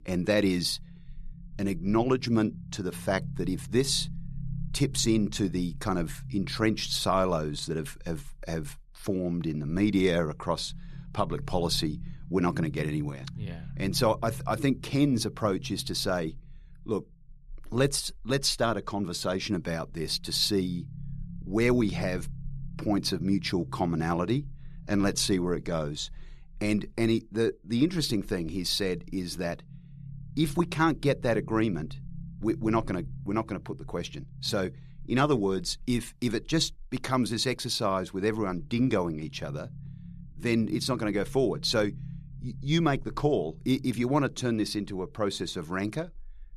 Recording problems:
low rumble; faint; throughout; 25 dB below the speech

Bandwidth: 13.5 kHz